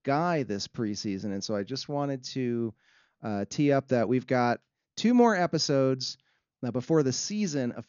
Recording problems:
high frequencies cut off; noticeable; nothing above 7 kHz

